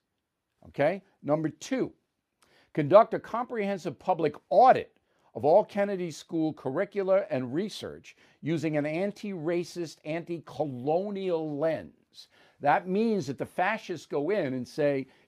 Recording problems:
none

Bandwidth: 15 kHz